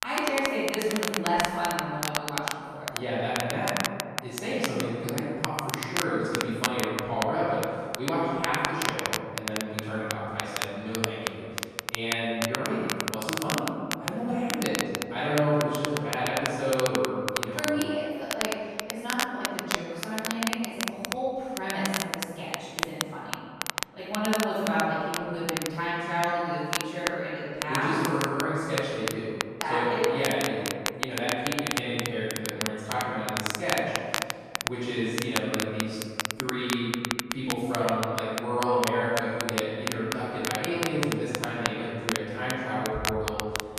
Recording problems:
room echo; strong; dies away in 2.1 s
off-mic speech; far
crackle, like an old record; loud; 3 dB below the speech

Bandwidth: 14 kHz